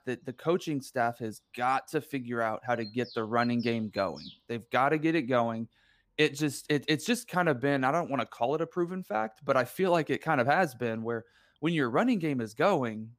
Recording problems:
animal sounds; noticeable; throughout; 20 dB below the speech

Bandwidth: 15 kHz